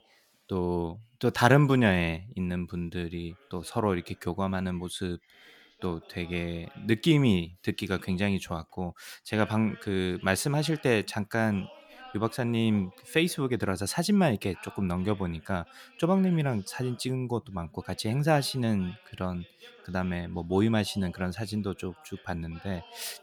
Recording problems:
voice in the background; faint; throughout; 25 dB below the speech

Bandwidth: 18.5 kHz